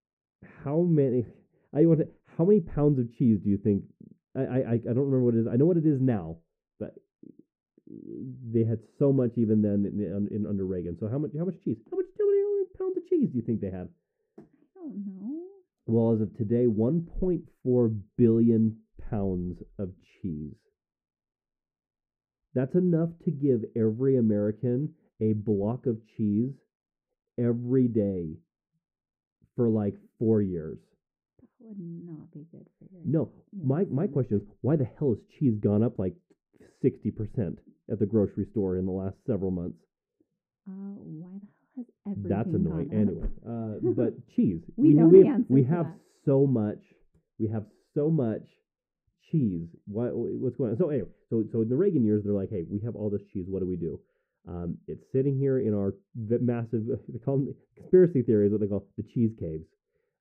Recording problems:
muffled; very; fading above 1 kHz

